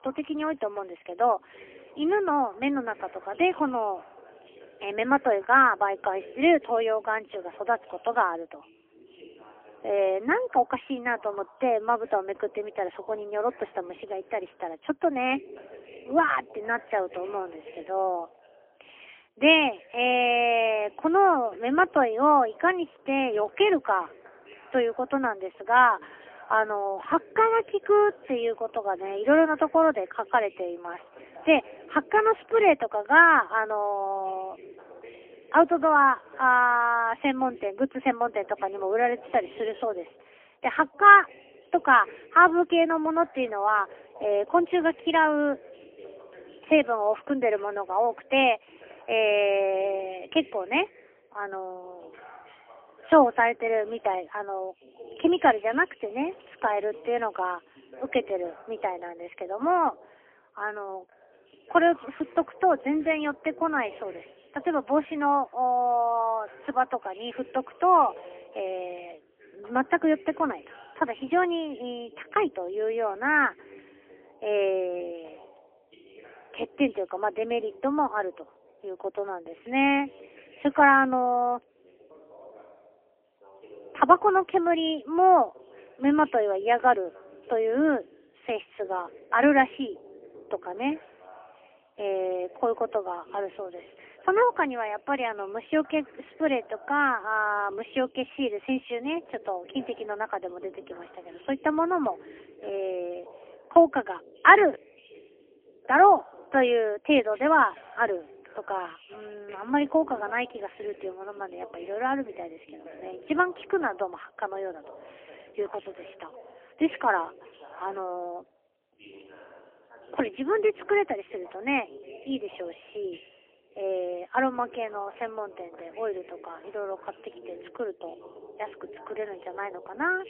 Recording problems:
phone-call audio; poor line; nothing above 3 kHz
voice in the background; faint; throughout; 25 dB below the speech

